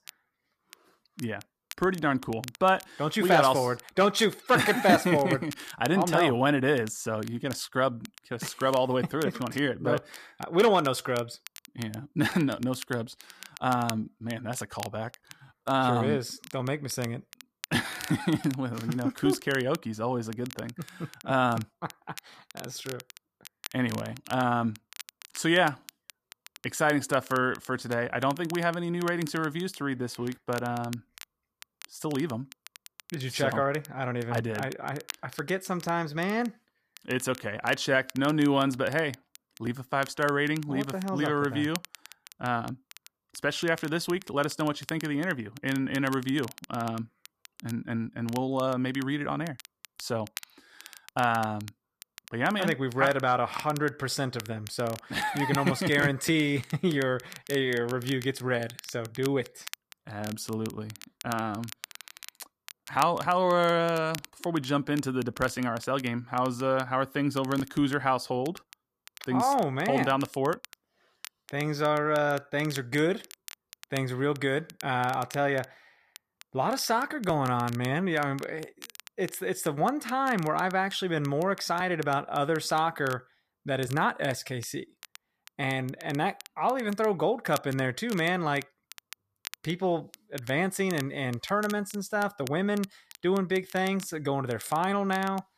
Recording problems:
crackle, like an old record; noticeable; 20 dB below the speech

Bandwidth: 14.5 kHz